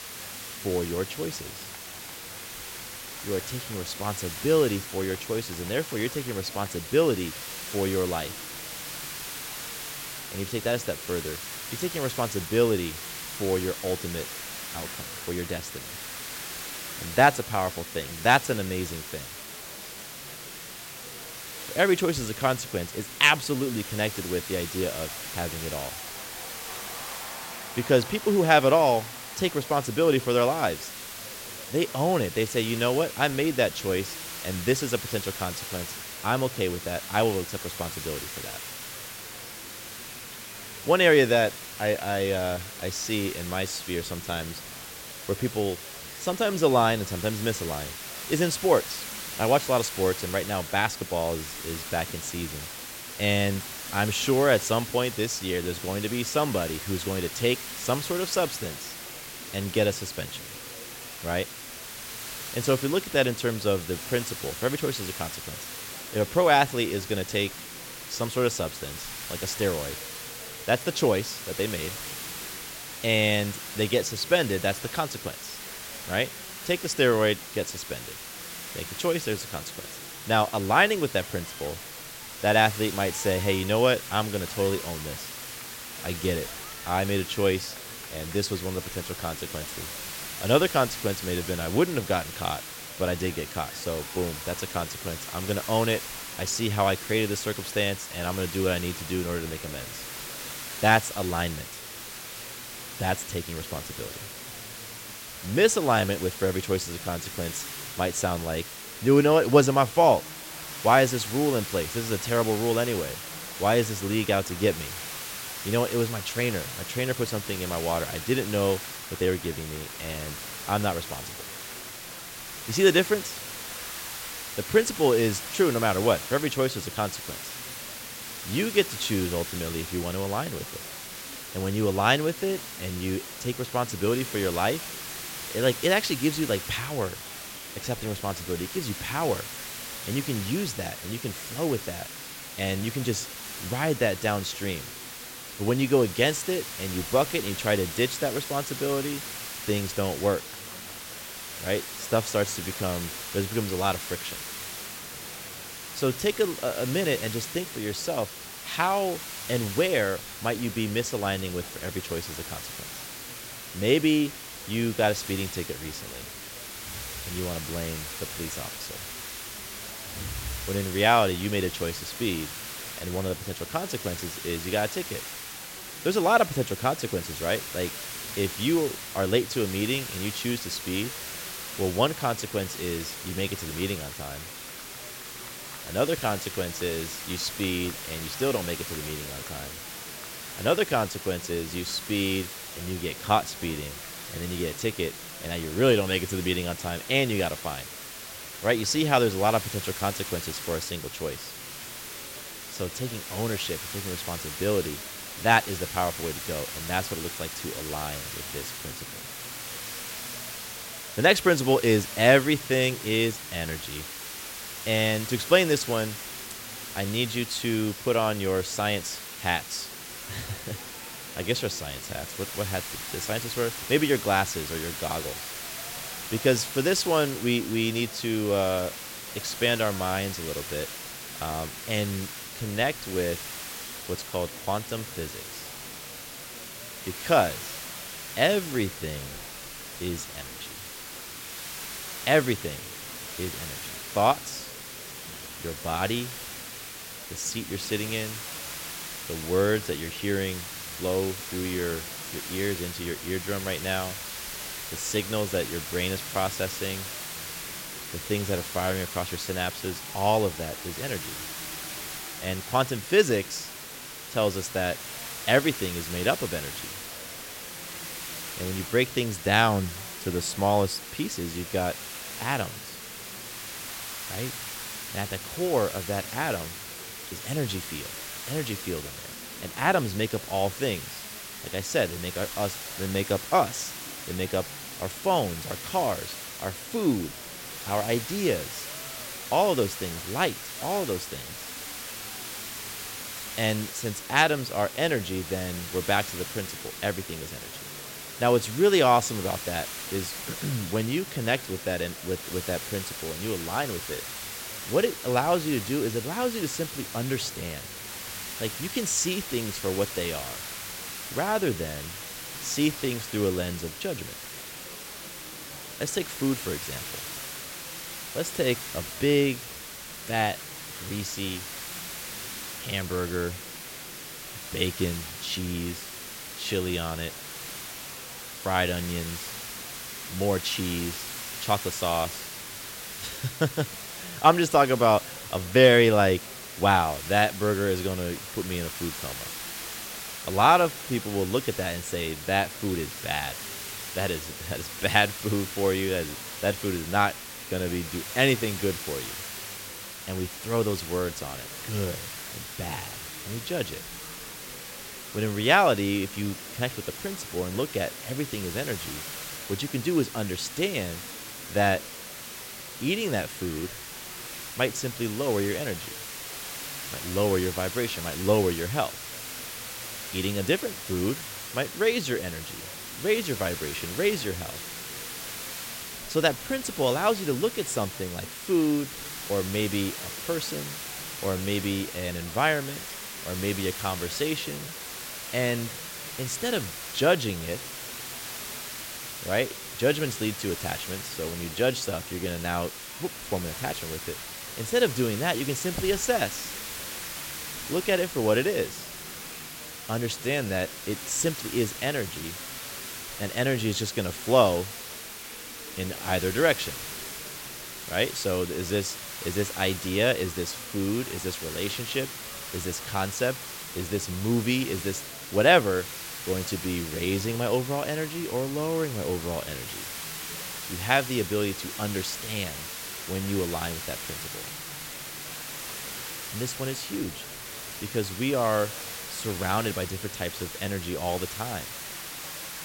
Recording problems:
hiss; loud; throughout; 8 dB below the speech
murmuring crowd; faint; throughout; 20 dB below the speech

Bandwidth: 16.5 kHz